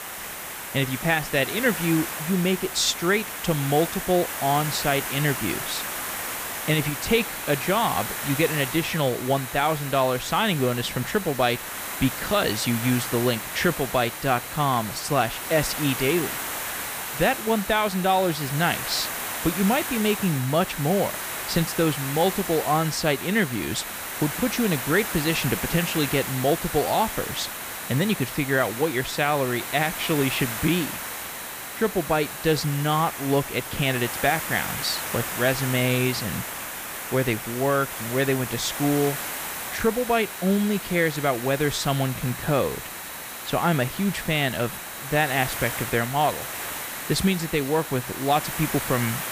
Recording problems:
hiss; loud; throughout; 6 dB below the speech
high-pitched whine; faint; from 7 to 33 s and from 39 s on; 4 kHz, 25 dB below the speech

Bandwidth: 15 kHz